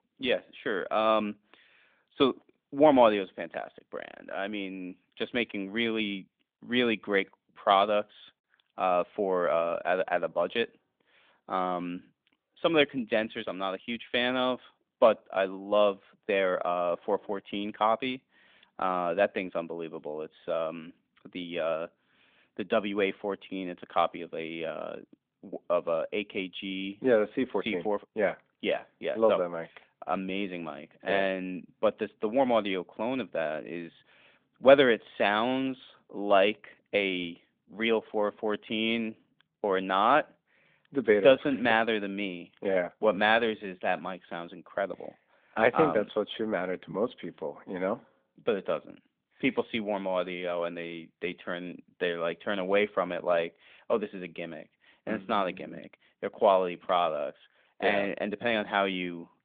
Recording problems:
phone-call audio; nothing above 3.5 kHz

